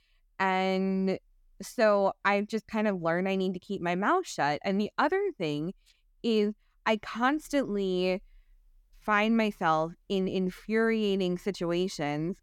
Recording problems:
none

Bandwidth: 18 kHz